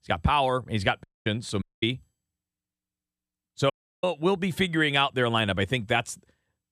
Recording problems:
audio cutting out; at 1 s, at 1.5 s and at 3.5 s

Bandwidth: 14 kHz